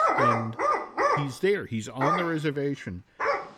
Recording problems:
animal sounds; very loud; throughout; 4 dB above the speech

